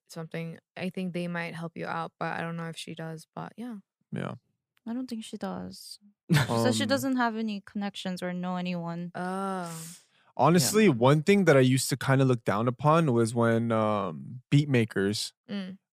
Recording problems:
none

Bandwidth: 15 kHz